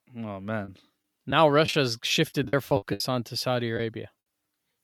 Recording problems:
choppy; very; 9% of the speech affected

